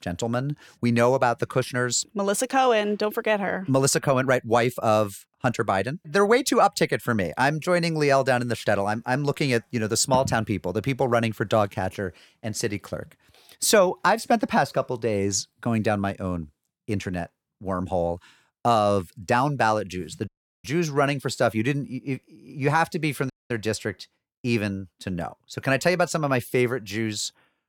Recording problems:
audio cutting out; at 20 s and at 23 s

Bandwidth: 18 kHz